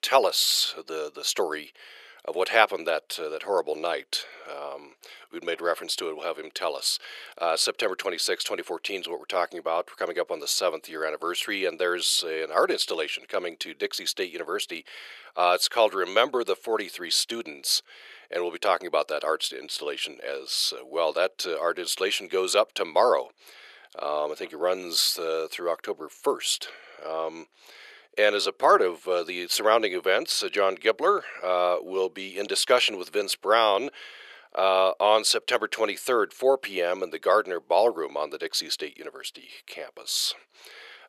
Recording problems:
thin; very; fading below 450 Hz

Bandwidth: 13.5 kHz